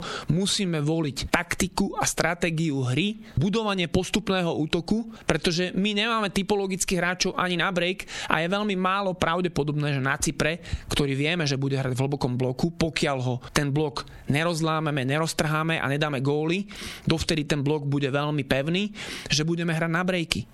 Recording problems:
squashed, flat; somewhat

